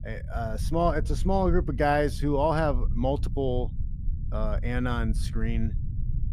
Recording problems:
low rumble; faint; throughout; 20 dB below the speech

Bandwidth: 15 kHz